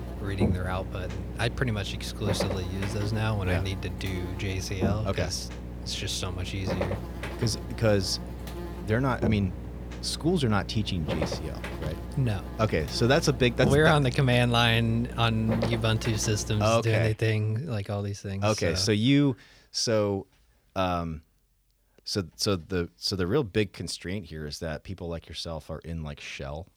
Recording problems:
electrical hum; loud; until 17 s; 60 Hz, 10 dB below the speech

